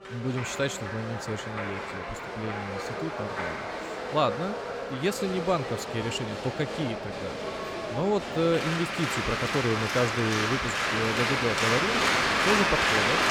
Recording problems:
crowd noise; very loud; throughout; 2 dB above the speech

